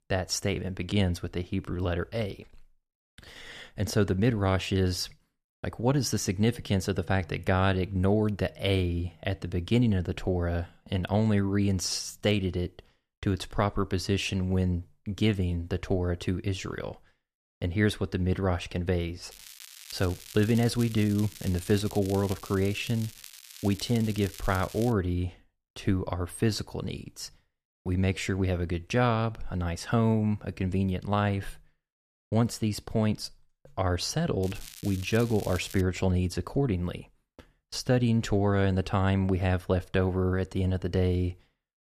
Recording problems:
crackling; noticeable; from 19 to 25 s and from 34 to 36 s; 15 dB below the speech

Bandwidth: 14.5 kHz